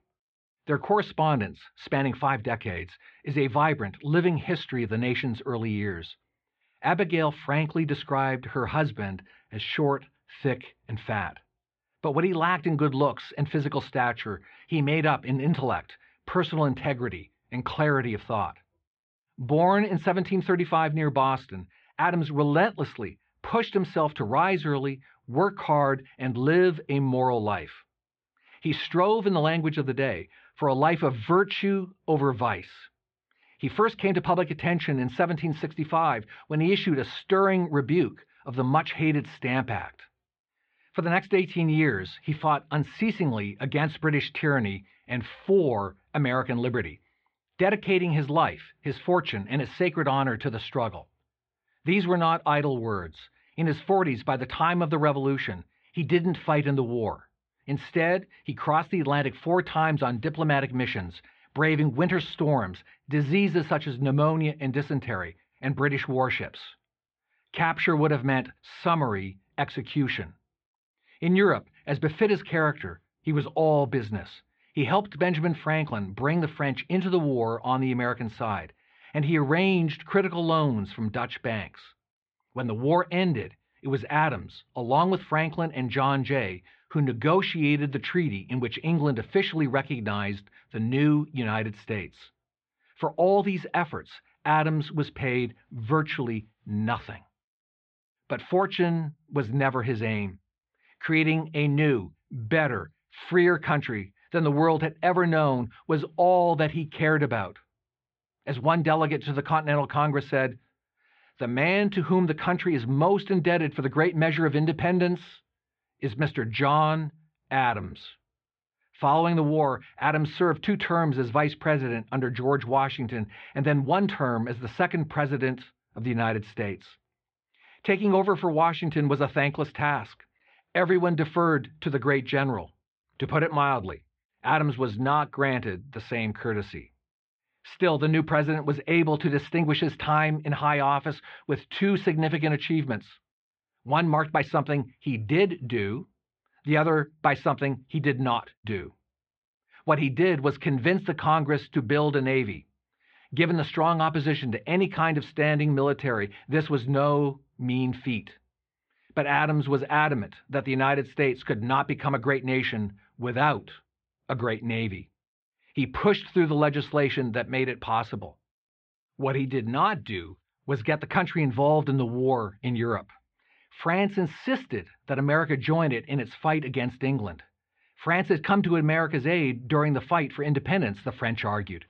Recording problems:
muffled; very; fading above 3.5 kHz

